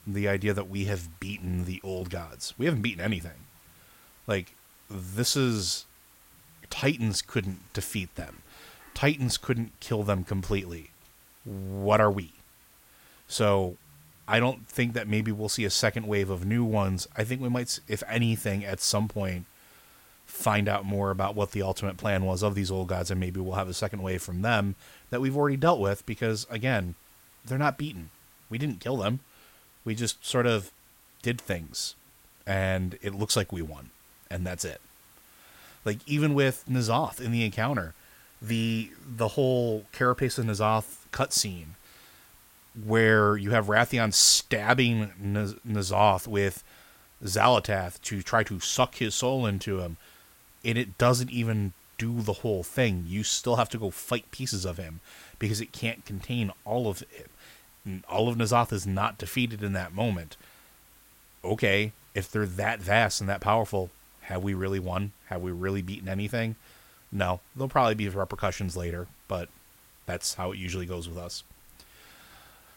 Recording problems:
hiss; faint; throughout; 25 dB below the speech

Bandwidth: 16.5 kHz